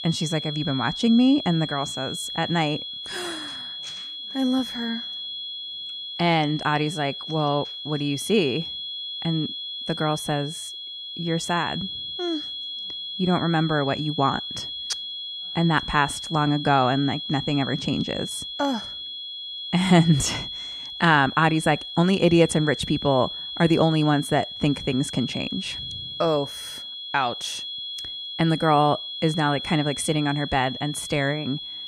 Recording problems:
high-pitched whine; loud; throughout; 3.5 kHz, 7 dB below the speech

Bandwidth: 14.5 kHz